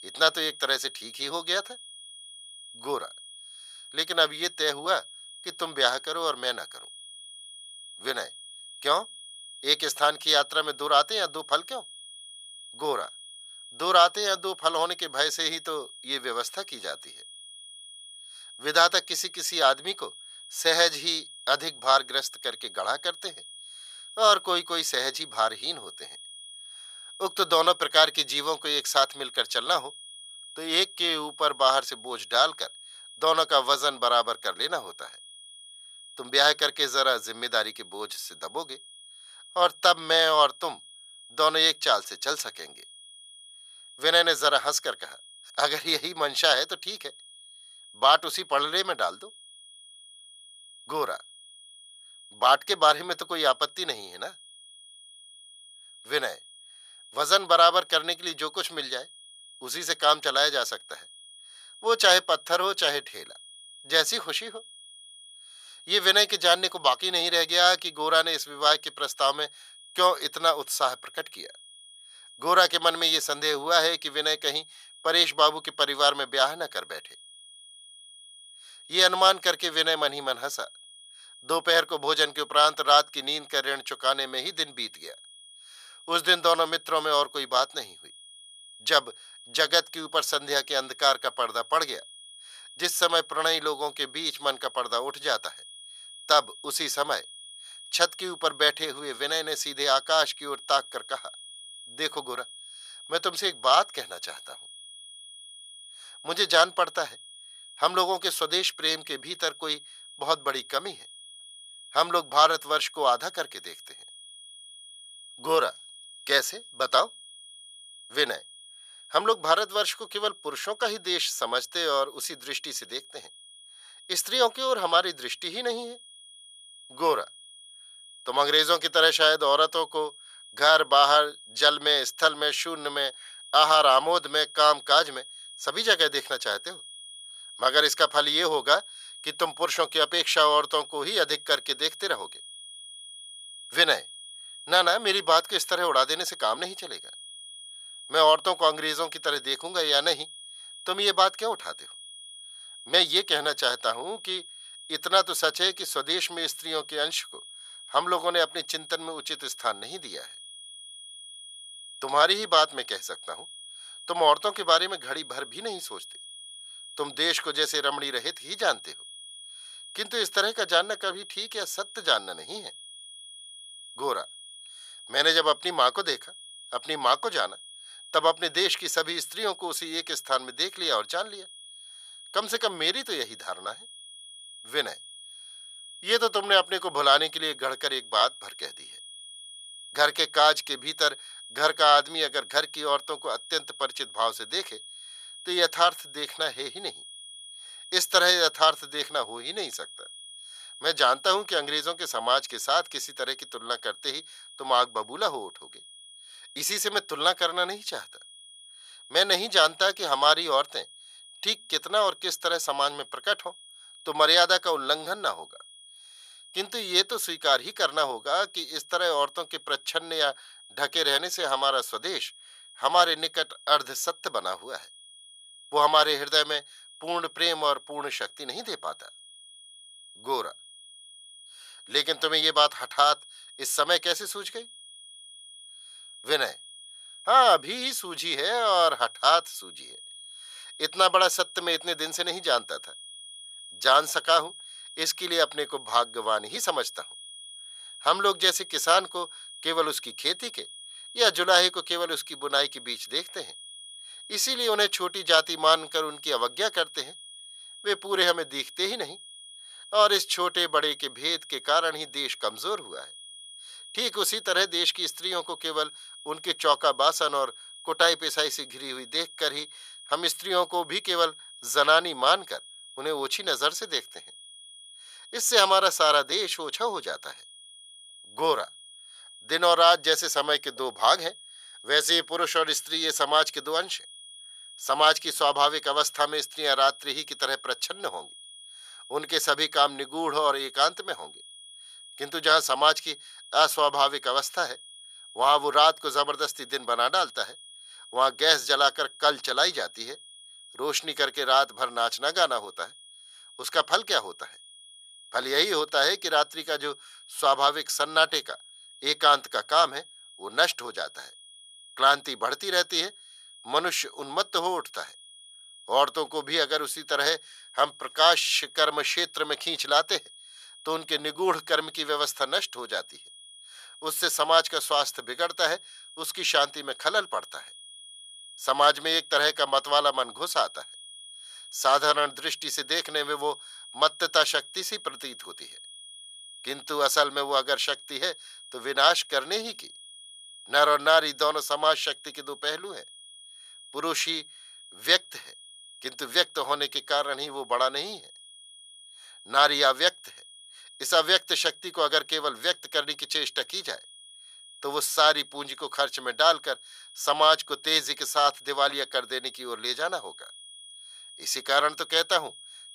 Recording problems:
thin; very; fading below 900 Hz
high-pitched whine; noticeable; throughout; 3.5 kHz, 20 dB below the speech

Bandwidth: 14.5 kHz